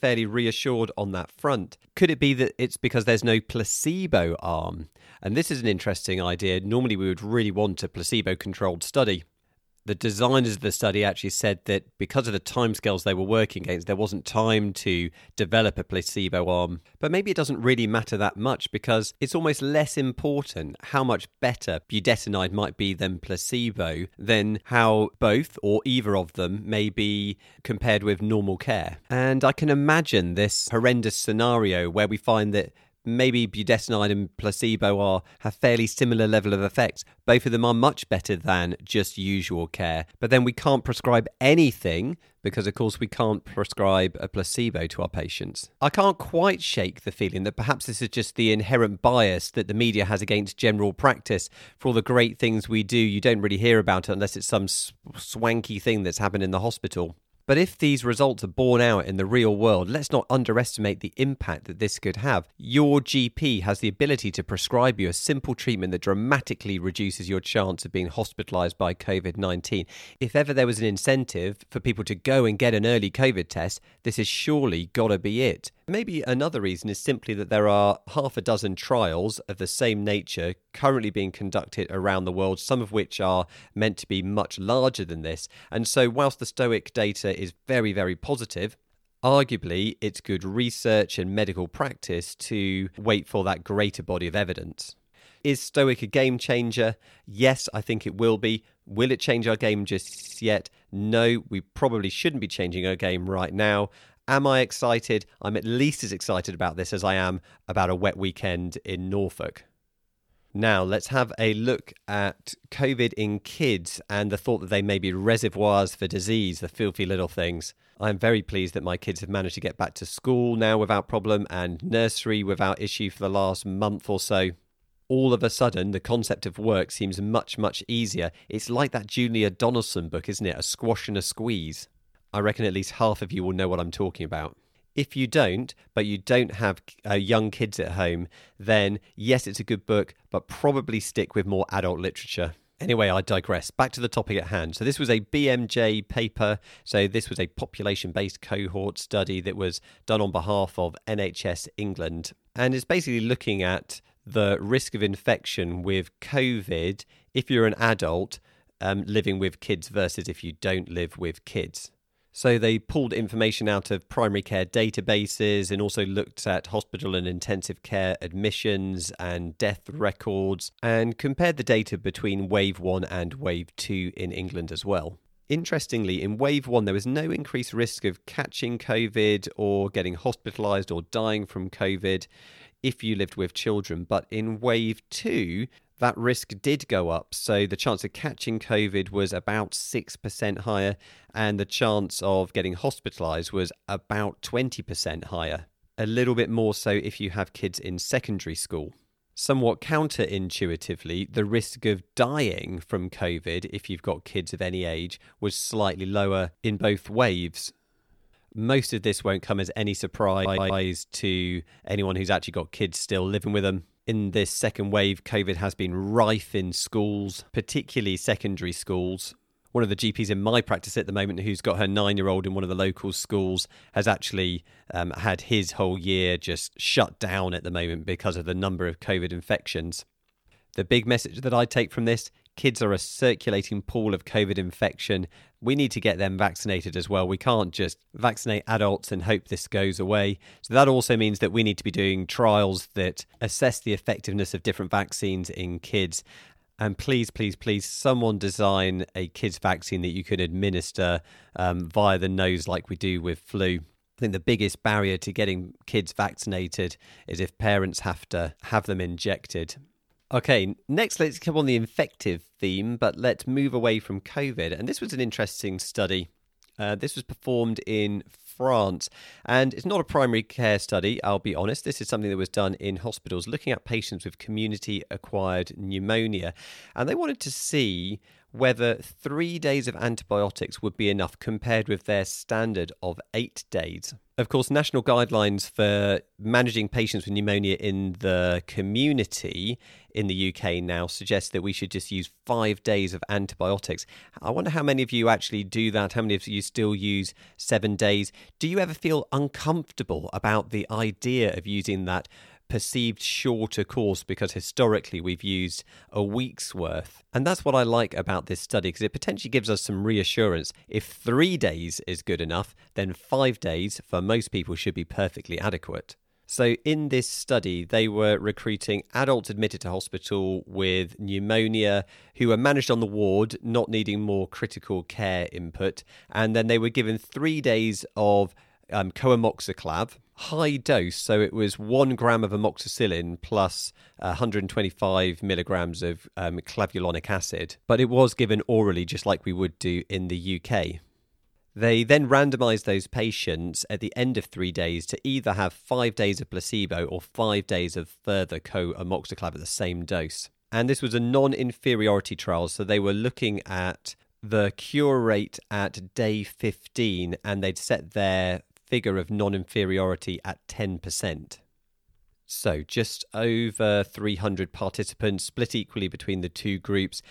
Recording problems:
audio stuttering; at 1:40 and at 3:30

